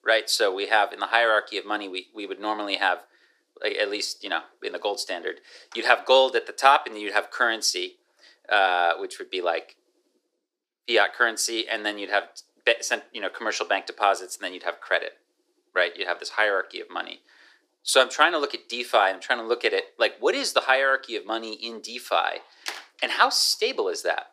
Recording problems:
thin; very; fading below 350 Hz

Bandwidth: 15 kHz